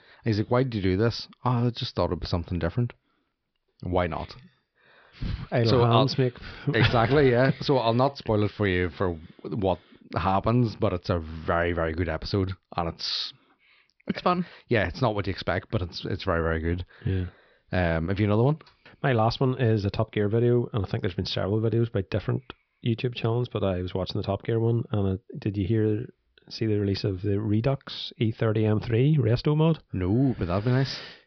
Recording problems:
high frequencies cut off; noticeable; nothing above 5.5 kHz

